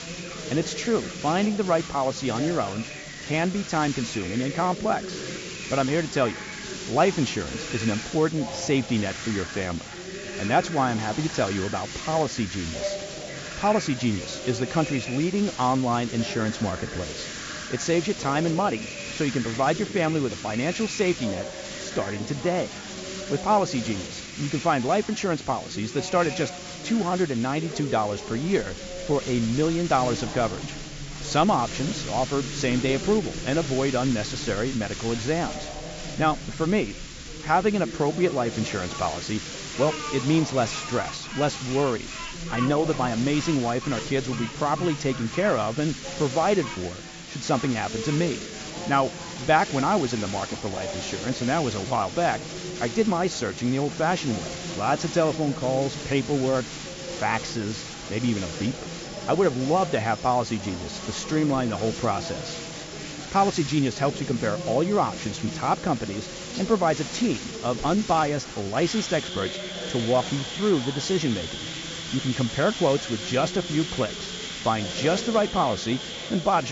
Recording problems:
high frequencies cut off; noticeable; nothing above 7.5 kHz
animal sounds; noticeable; throughout; 15 dB below the speech
background chatter; noticeable; throughout; 3 voices, 15 dB below the speech
hiss; noticeable; throughout; 10 dB below the speech
abrupt cut into speech; at the end

